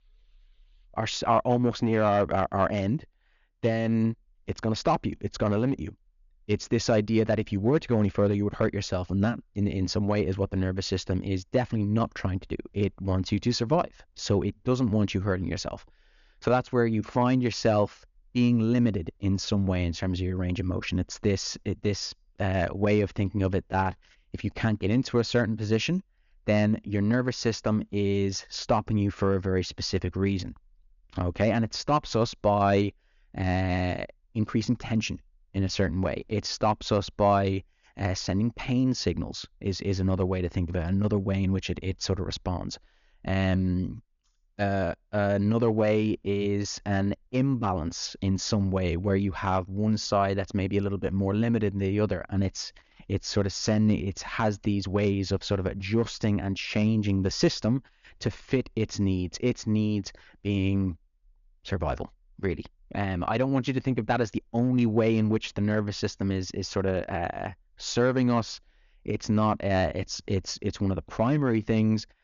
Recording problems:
high frequencies cut off; noticeable; nothing above 7 kHz

